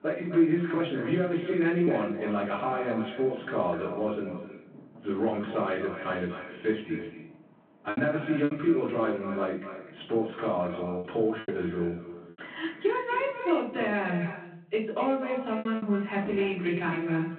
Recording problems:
echo of what is said; strong; throughout; 250 ms later, 10 dB below the speech
off-mic speech; far
room echo; slight; dies away in 0.3 s
phone-call audio
traffic noise; faint; throughout; 20 dB below the speech
choppy; occasionally; 3% of the speech affected

